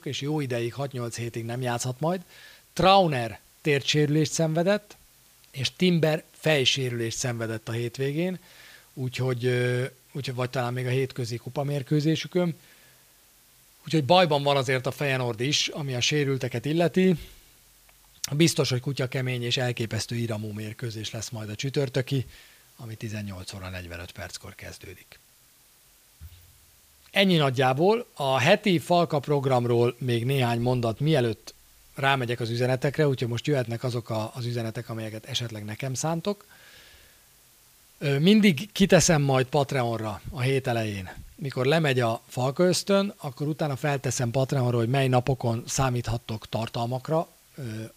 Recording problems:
hiss; faint; throughout; 30 dB below the speech

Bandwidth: 15 kHz